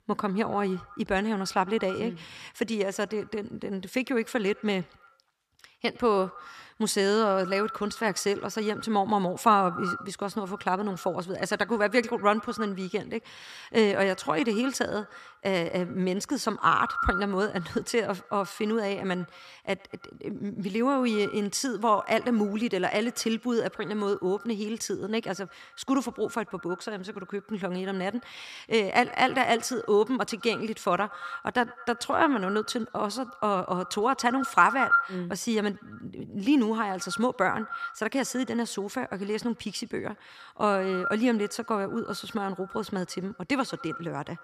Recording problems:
echo of what is said; strong; throughout; 100 ms later, 10 dB below the speech

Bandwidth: 14.5 kHz